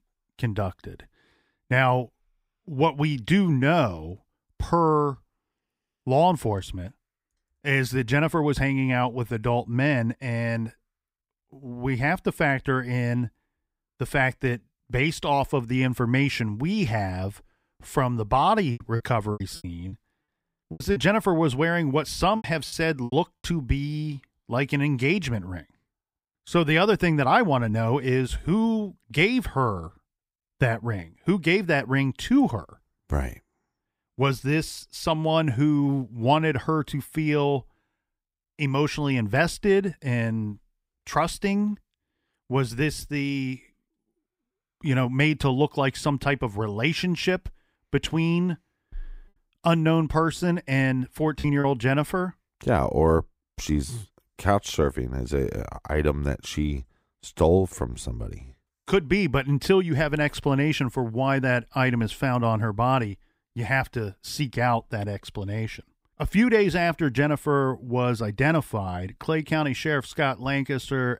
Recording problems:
choppy; very; from 19 to 23 s and at 51 s; 11% of the speech affected

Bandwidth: 15.5 kHz